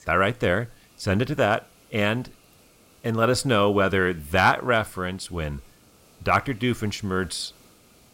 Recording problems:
hiss; faint; throughout; 30 dB below the speech

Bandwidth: 16 kHz